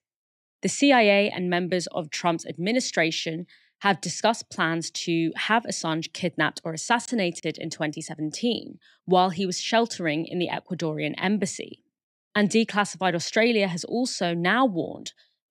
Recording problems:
none

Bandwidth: 15.5 kHz